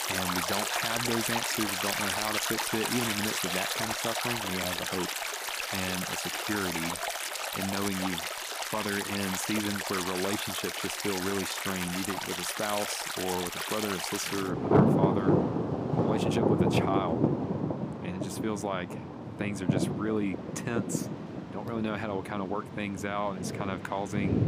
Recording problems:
rain or running water; very loud; throughout; 3 dB above the speech

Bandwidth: 15 kHz